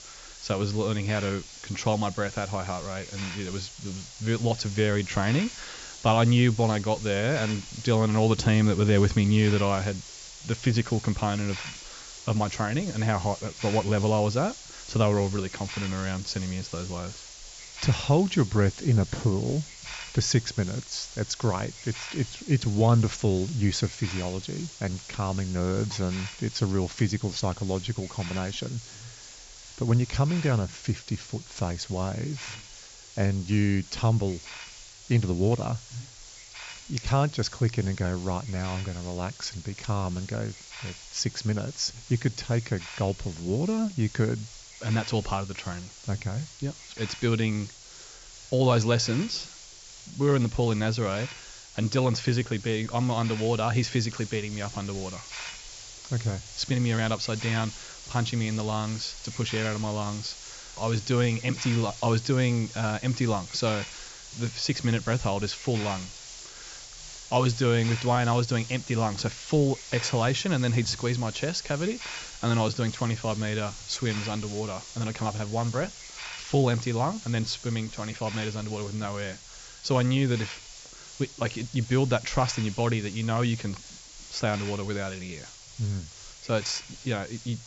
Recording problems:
high frequencies cut off; noticeable; nothing above 7.5 kHz
hiss; noticeable; throughout; 15 dB below the speech

